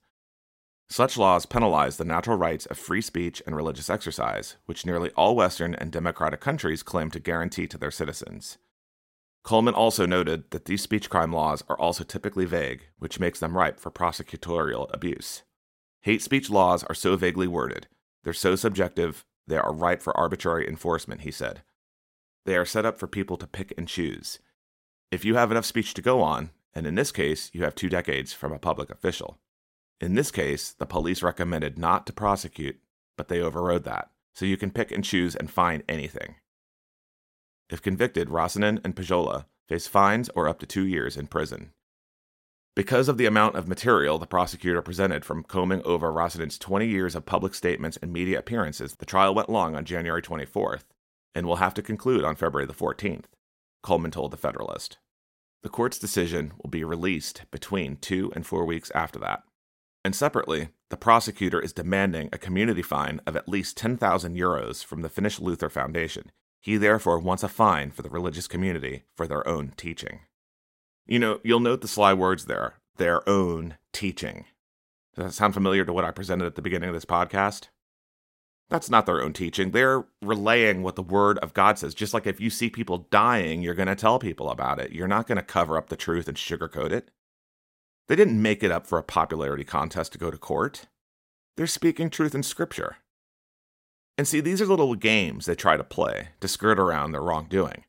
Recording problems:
none

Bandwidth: 16 kHz